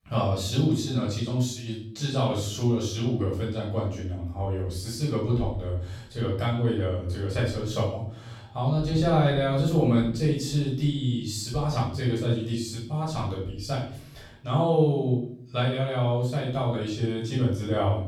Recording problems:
off-mic speech; far
room echo; noticeable; dies away in 0.6 s

